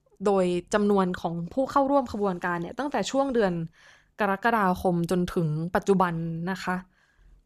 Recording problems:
none

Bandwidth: 14 kHz